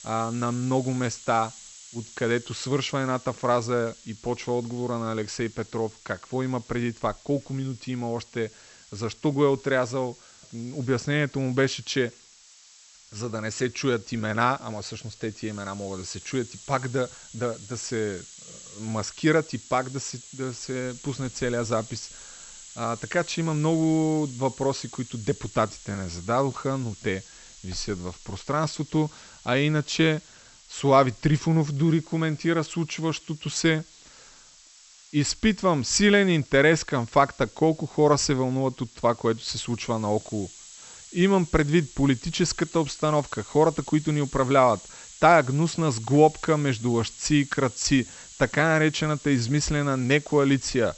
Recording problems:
high frequencies cut off; noticeable; nothing above 8 kHz
hiss; noticeable; throughout; 20 dB below the speech

